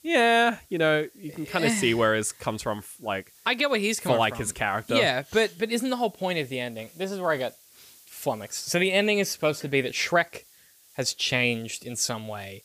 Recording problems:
hiss; faint; throughout; 25 dB below the speech

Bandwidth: 15 kHz